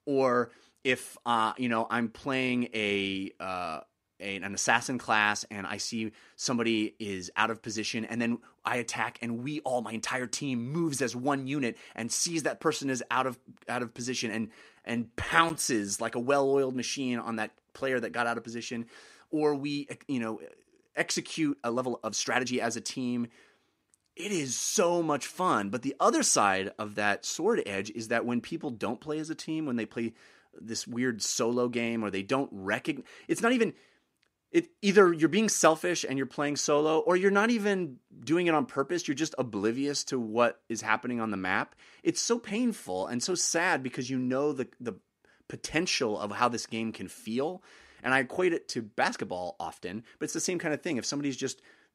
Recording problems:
uneven, jittery; strongly; from 9.5 to 43 s

